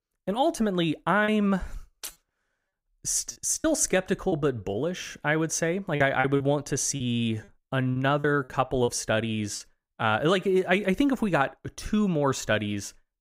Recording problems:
choppy; very; from 1 to 4.5 s and from 6 to 9.5 s; 8% of the speech affected

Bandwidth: 15.5 kHz